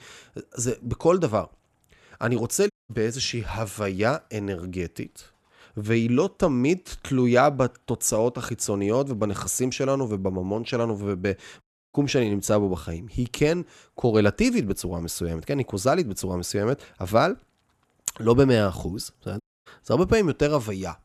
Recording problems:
audio cutting out; at 2.5 s, at 12 s and at 19 s

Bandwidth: 13.5 kHz